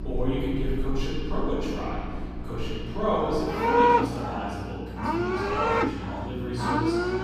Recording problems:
room echo; strong; dies away in 1.9 s
off-mic speech; far
animal sounds; very loud; throughout; 4 dB above the speech
electrical hum; noticeable; throughout; 60 Hz, 15 dB below the speech

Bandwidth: 15.5 kHz